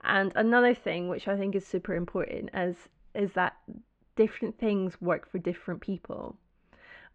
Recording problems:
muffled; very; fading above 3 kHz

